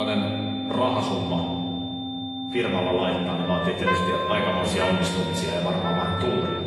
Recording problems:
off-mic speech; far
room echo; noticeable; dies away in 2.2 s
garbled, watery; slightly; nothing above 11.5 kHz
high-pitched whine; loud; throughout; 3.5 kHz, 9 dB below the speech
background music; loud; throughout; 5 dB below the speech
abrupt cut into speech; at the start

